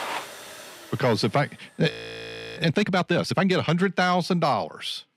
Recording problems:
household noises; noticeable; until 2.5 s; 15 dB below the speech
audio freezing; at 2 s for 0.5 s

